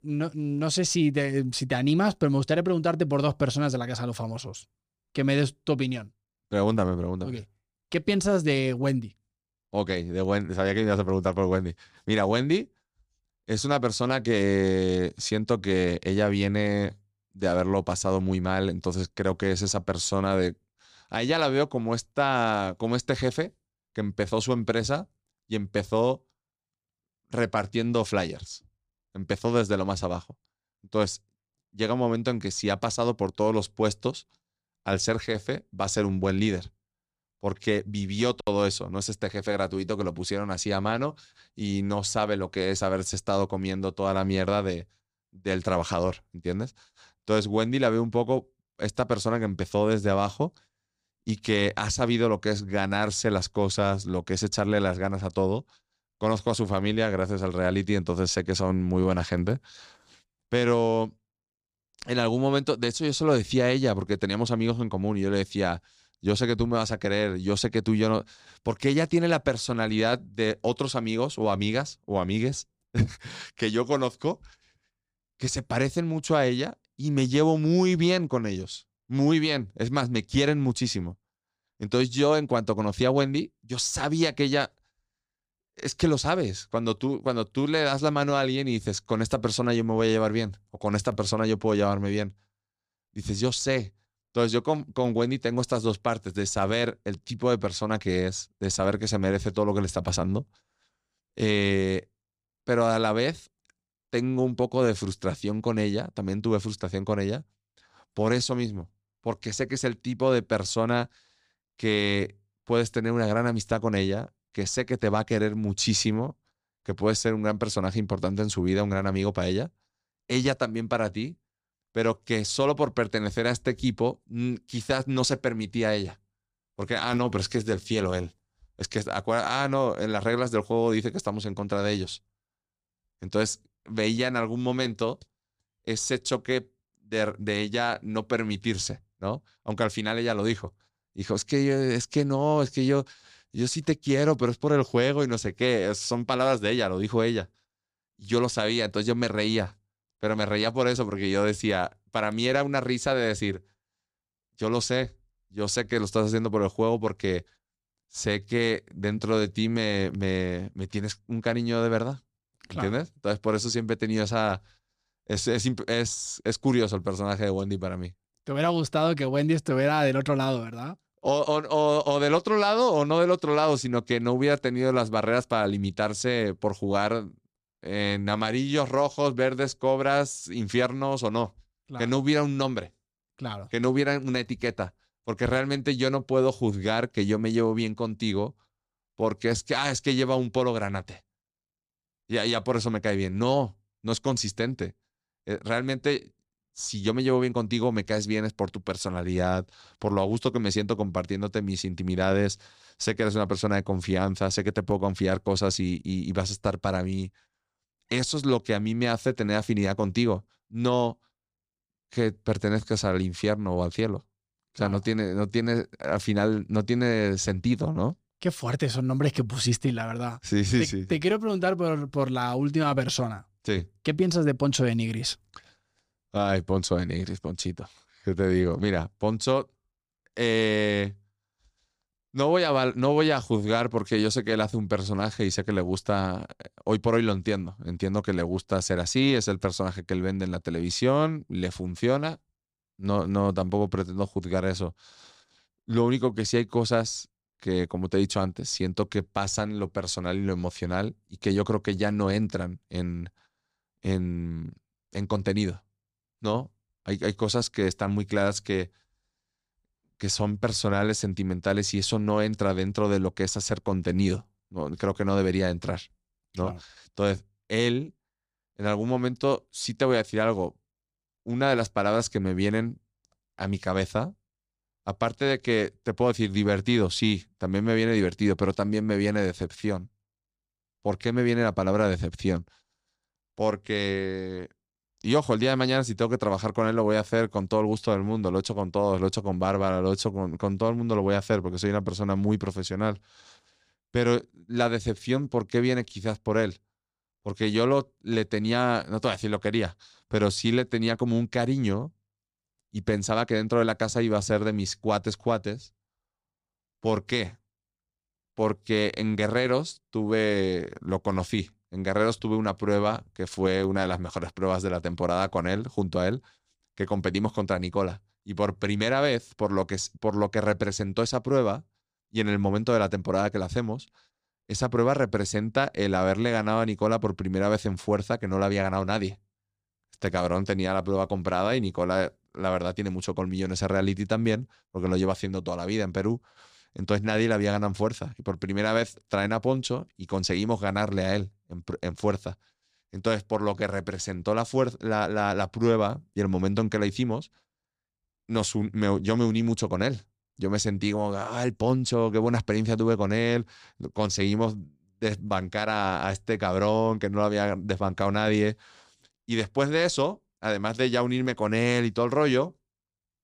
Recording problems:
none

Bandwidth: 15 kHz